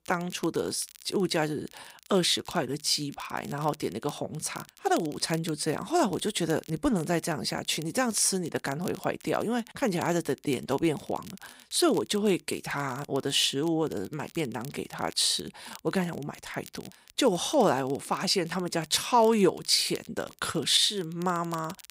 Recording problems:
crackle, like an old record; faint; 20 dB below the speech

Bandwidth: 15.5 kHz